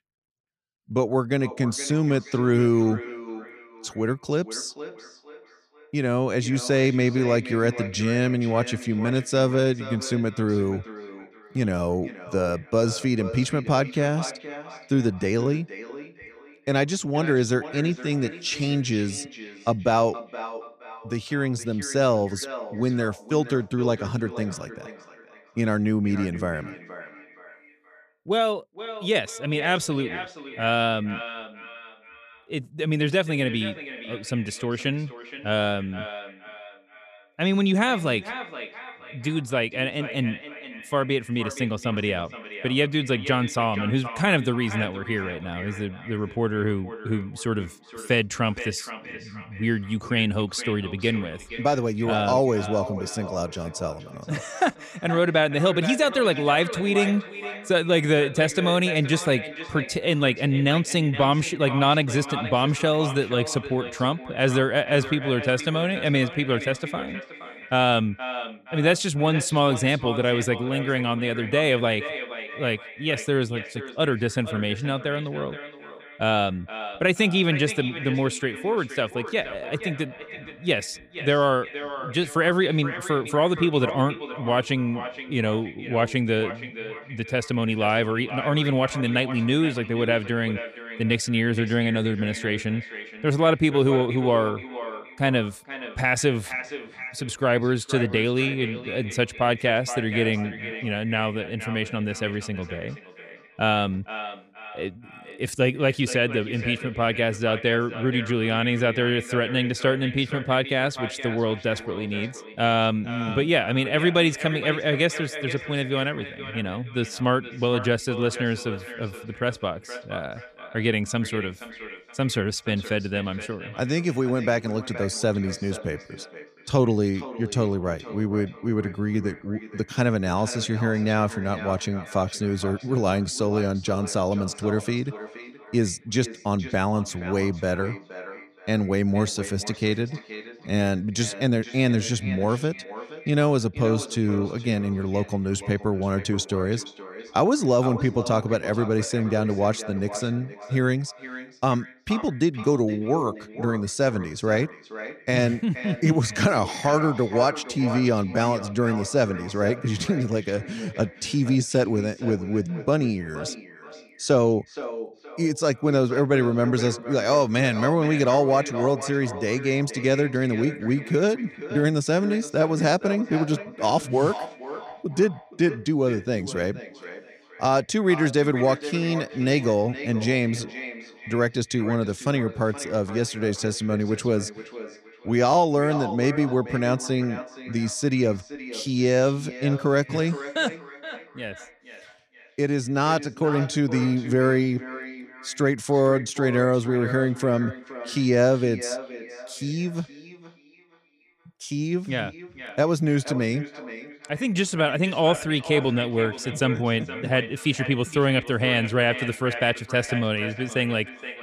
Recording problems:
echo of what is said; noticeable; throughout; 470 ms later, 15 dB below the speech

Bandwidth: 15 kHz